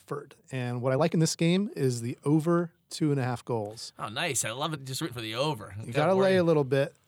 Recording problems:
uneven, jittery; strongly; from 0.5 to 6 s

